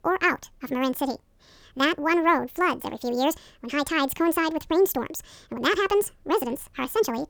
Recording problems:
wrong speed and pitch; too fast and too high; 1.7 times normal speed

